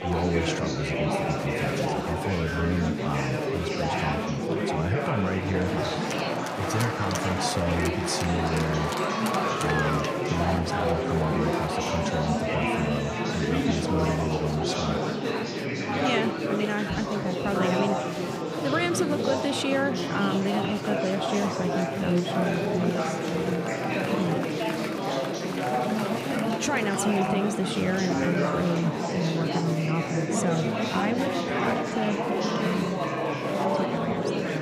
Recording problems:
murmuring crowd; very loud; throughout; 2 dB above the speech

